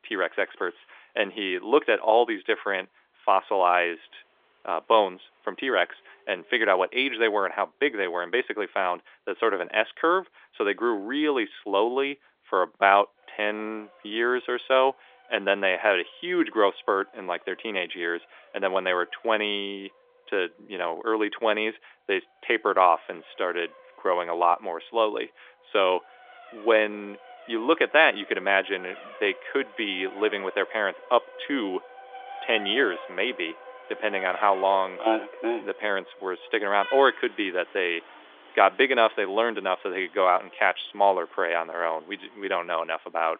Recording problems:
phone-call audio; nothing above 3.5 kHz
traffic noise; noticeable; throughout; 20 dB below the speech

